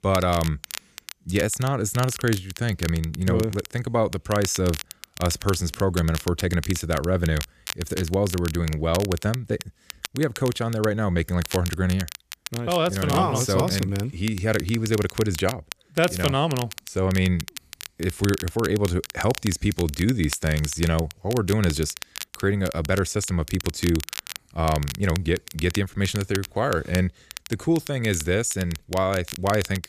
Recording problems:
crackle, like an old record; noticeable; 10 dB below the speech

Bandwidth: 14.5 kHz